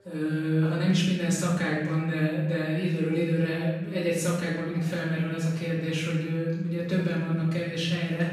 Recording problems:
off-mic speech; far
room echo; noticeable; dies away in 1 s
background chatter; faint; throughout; 4 voices, 25 dB below the speech

